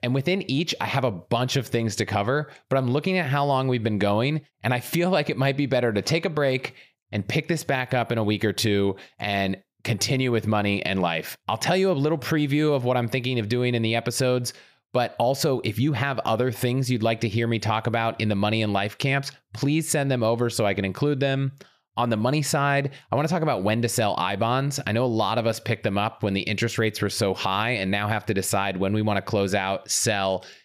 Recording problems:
none

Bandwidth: 15 kHz